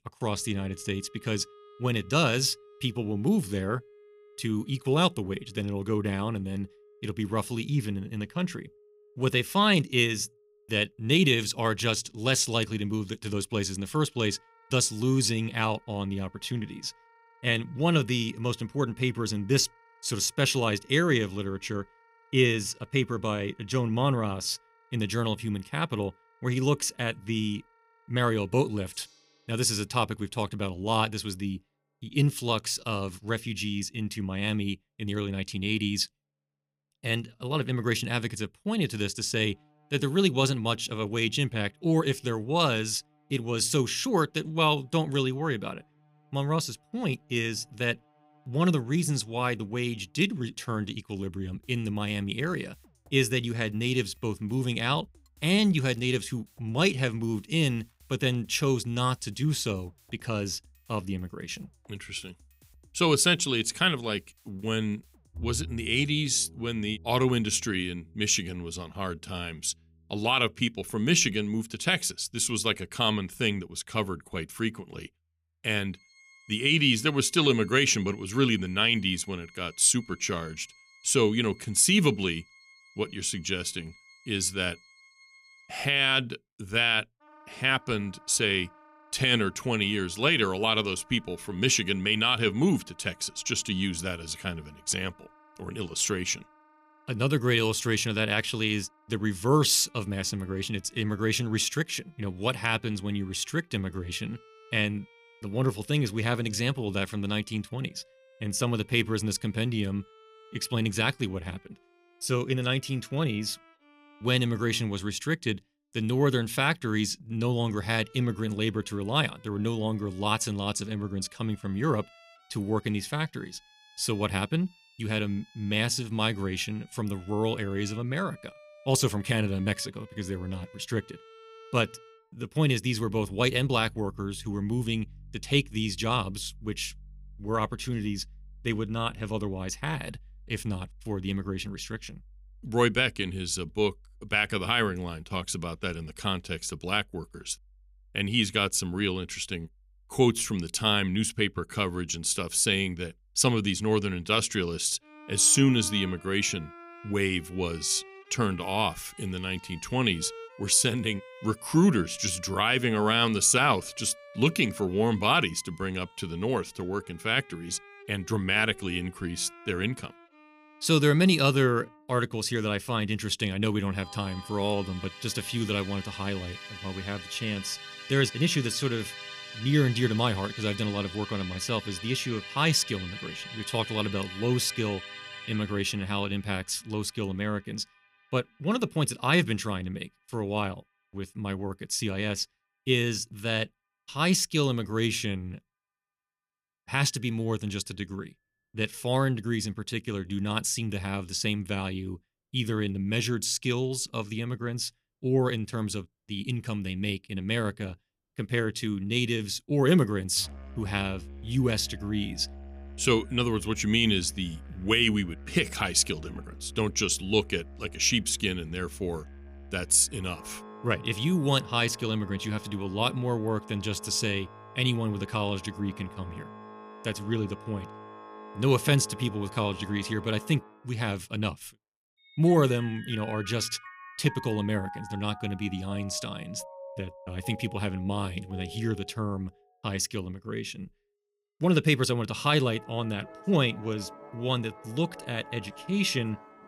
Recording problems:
background music; noticeable; throughout; 20 dB below the speech

